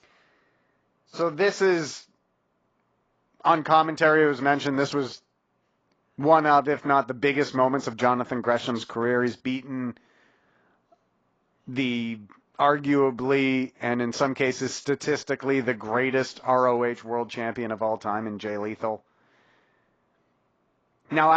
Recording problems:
garbled, watery; badly; nothing above 7.5 kHz
abrupt cut into speech; at the end

